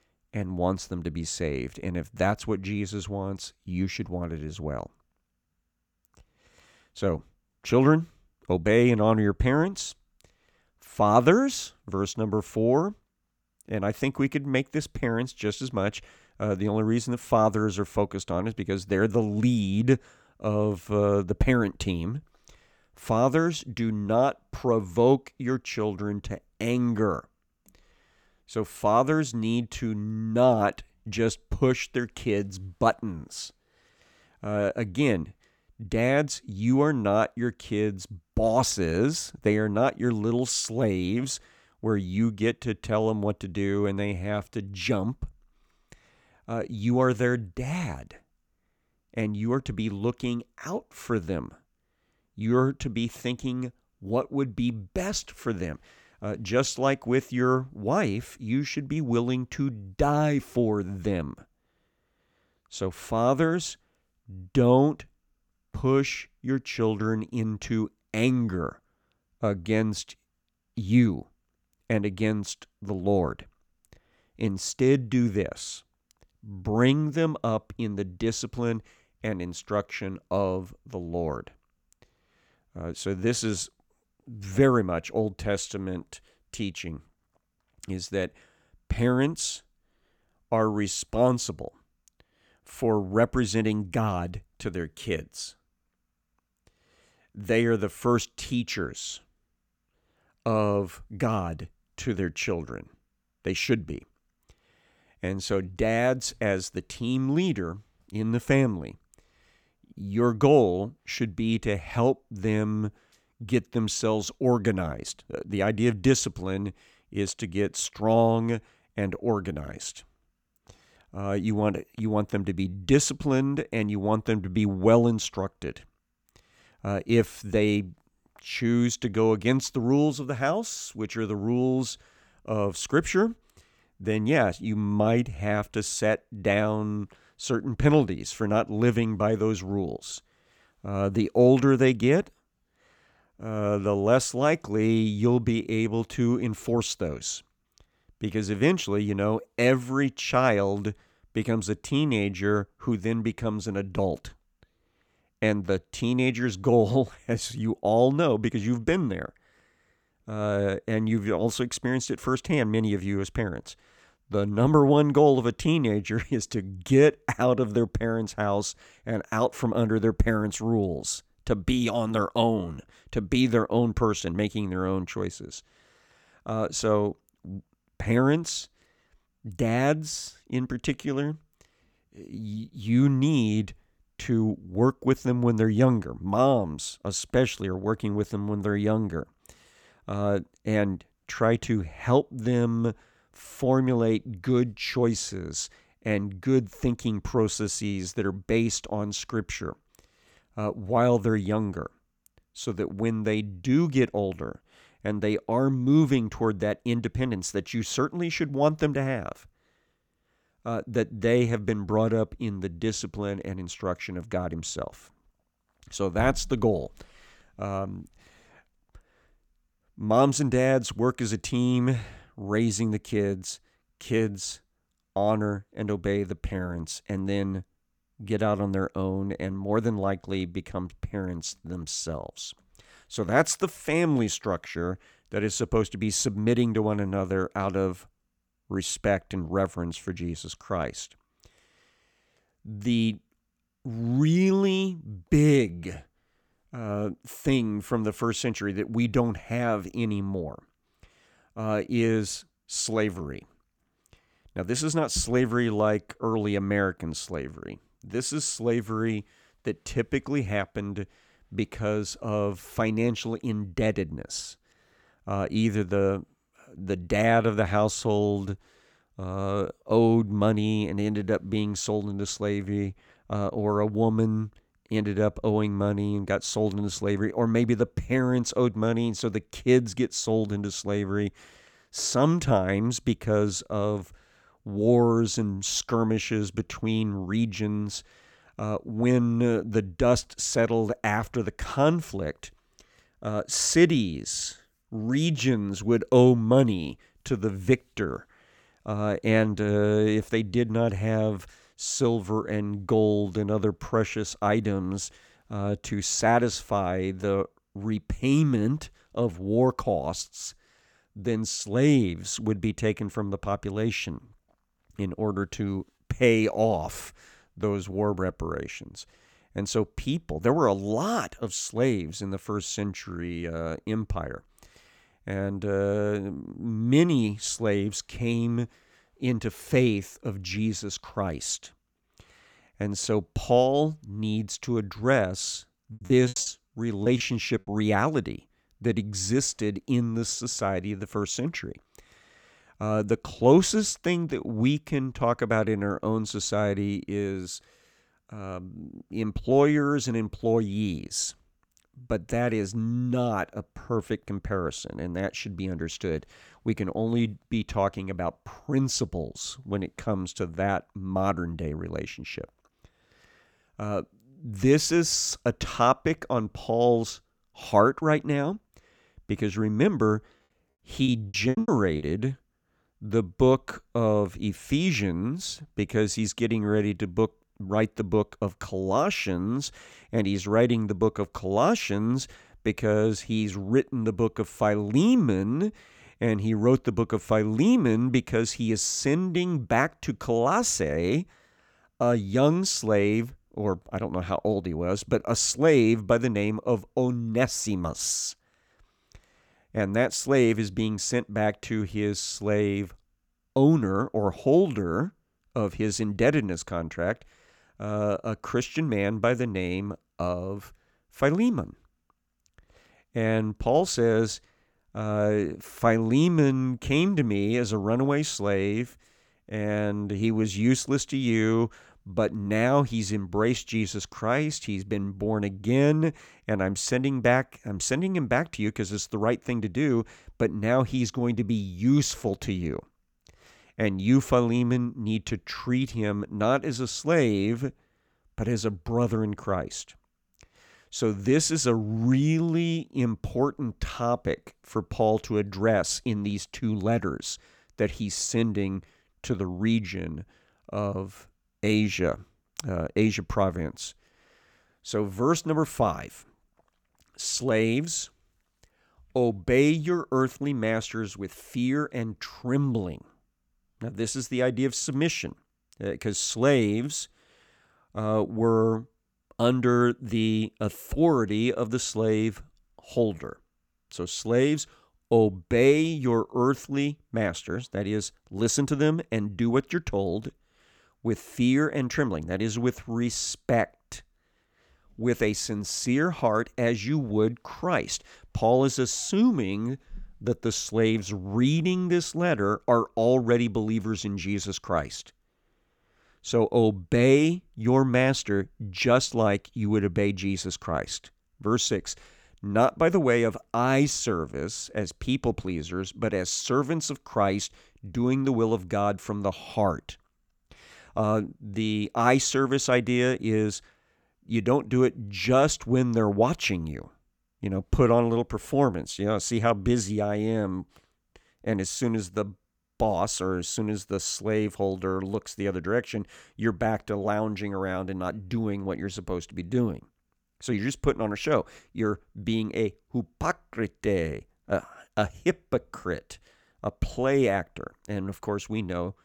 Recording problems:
choppy; very; from 5:36 to 5:38 and at 6:11; 18% of the speech affected

